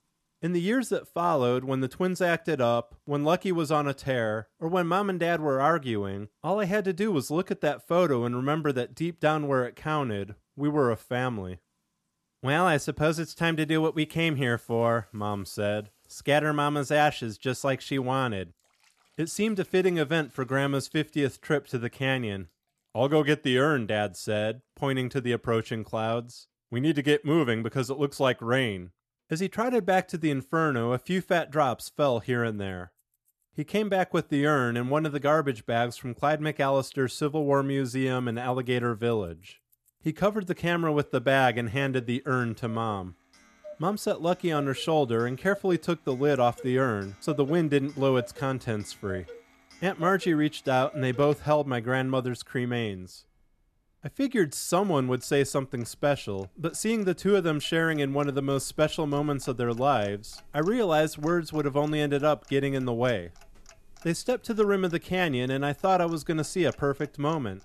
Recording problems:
household noises; faint; throughout; 25 dB below the speech

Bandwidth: 13.5 kHz